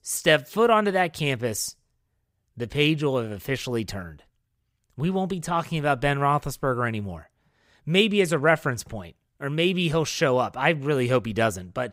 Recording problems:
none

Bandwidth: 15.5 kHz